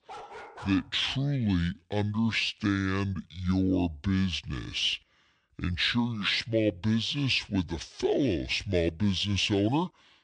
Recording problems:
wrong speed and pitch; too slow and too low; 0.6 times normal speed
dog barking; faint; at the start; peak 15 dB below the speech

